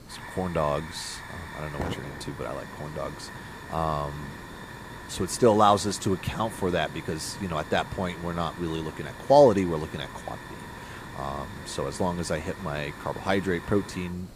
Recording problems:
hiss; noticeable; throughout; 15 dB below the speech

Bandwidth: 15 kHz